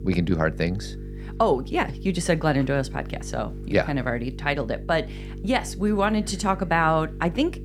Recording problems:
electrical hum; faint; throughout; 50 Hz, 20 dB below the speech

